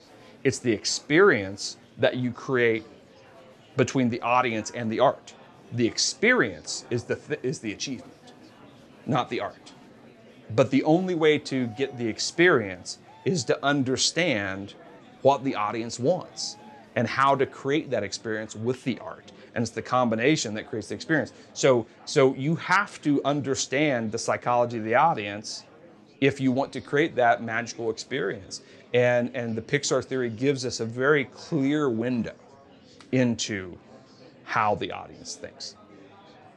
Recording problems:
murmuring crowd; faint; throughout; 25 dB below the speech

